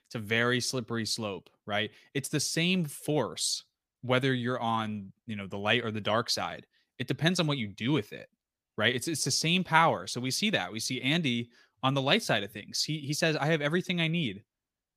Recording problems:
none

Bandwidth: 15 kHz